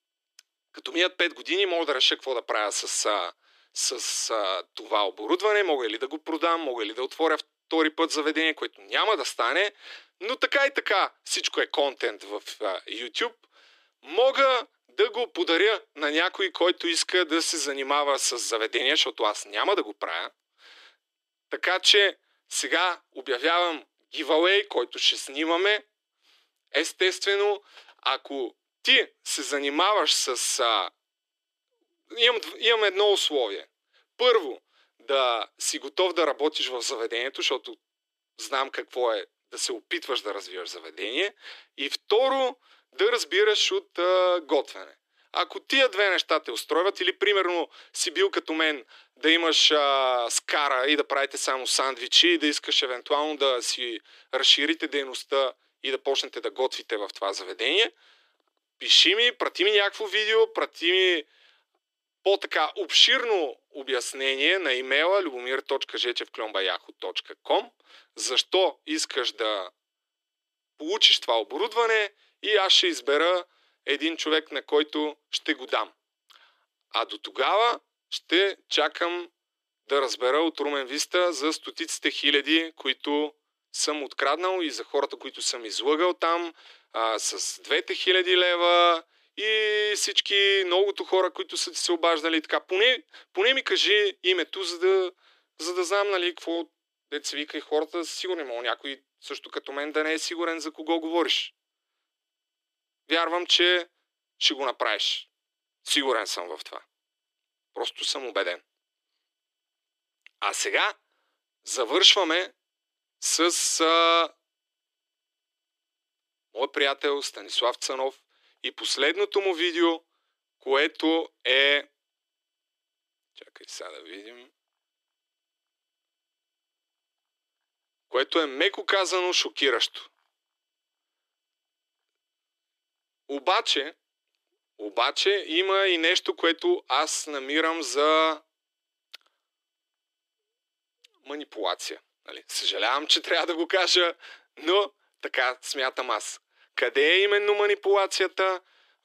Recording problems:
thin; somewhat; fading below 300 Hz

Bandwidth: 14.5 kHz